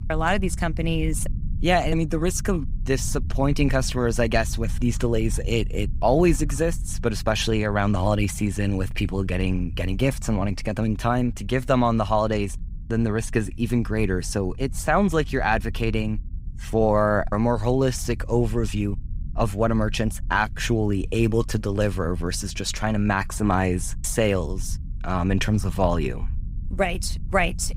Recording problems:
low rumble; faint; throughout; 25 dB below the speech

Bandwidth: 15.5 kHz